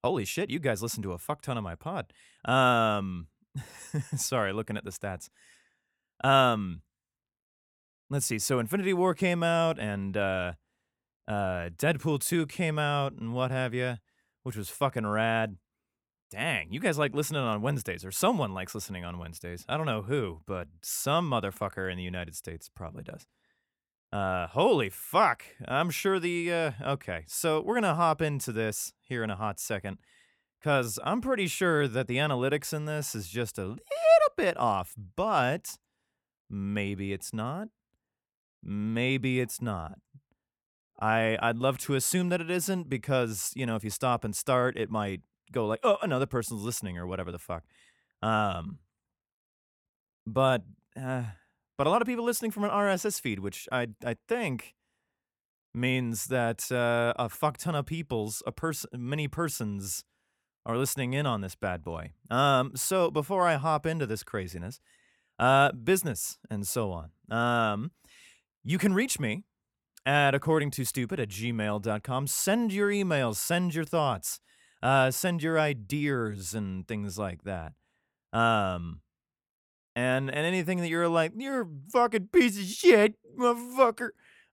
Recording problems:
none

